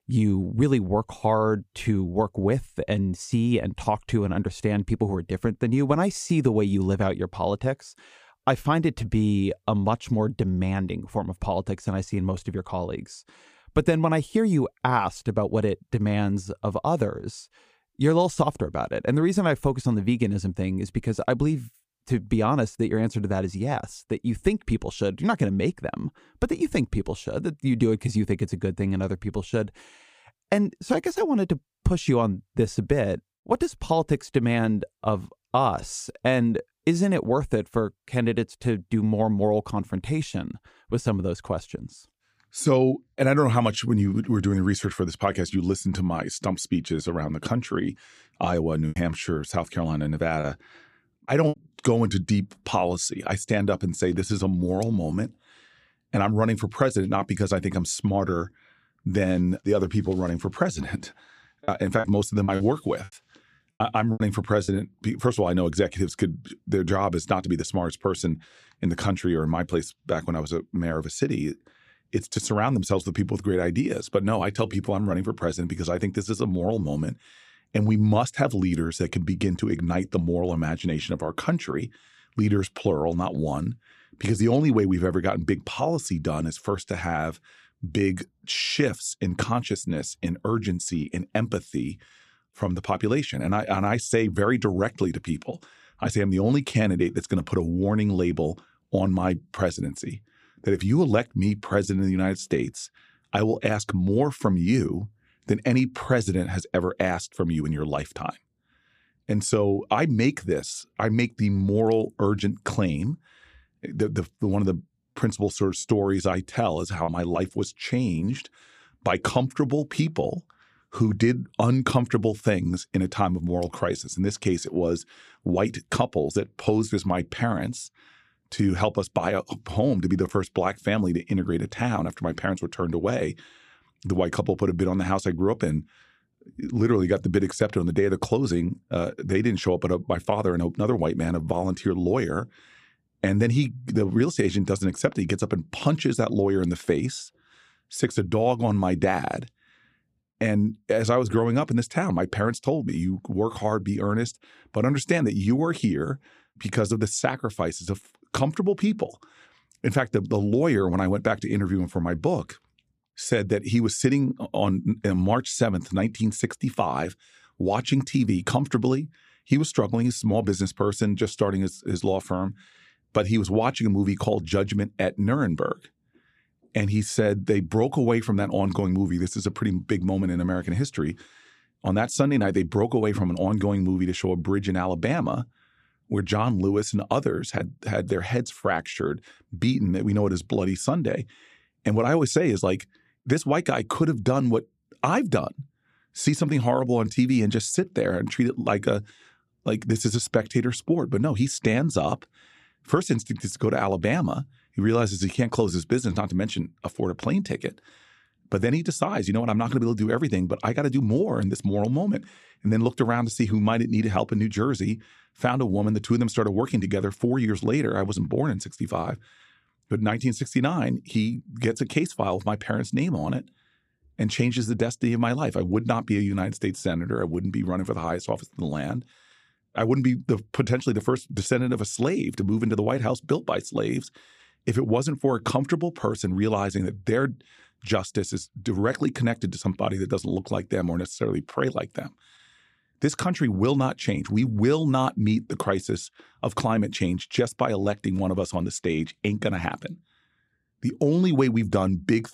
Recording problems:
choppy; very; from 49 to 52 s, from 1:02 to 1:05 and from 1:56 to 1:57; 9% of the speech affected

